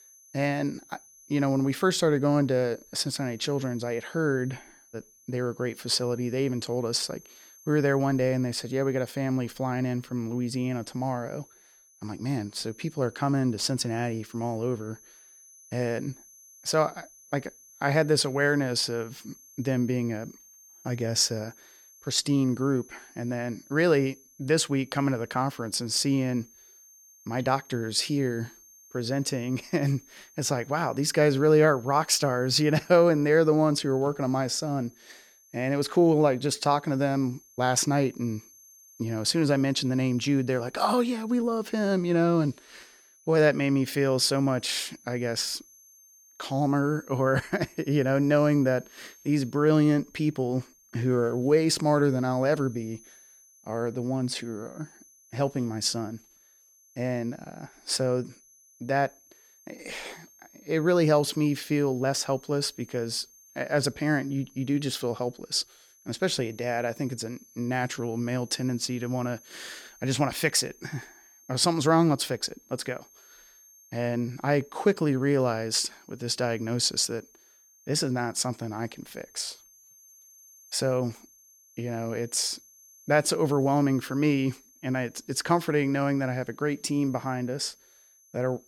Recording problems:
high-pitched whine; faint; throughout; 6 kHz, 25 dB below the speech

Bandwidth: 18.5 kHz